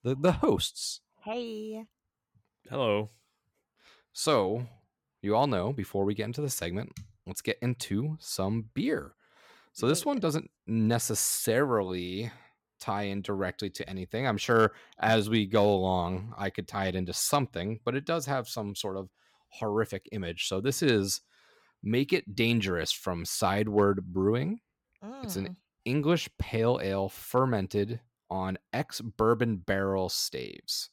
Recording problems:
none

